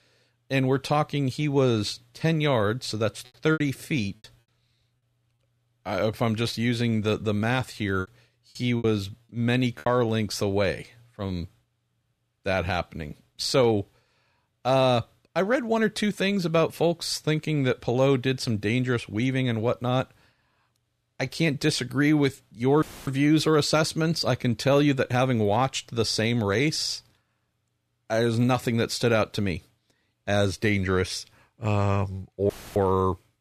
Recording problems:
choppy; very; at 3.5 s and from 8 to 10 s; 11% of the speech affected
audio cutting out; filled with static; at 23 s and at 33 s

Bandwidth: 14.5 kHz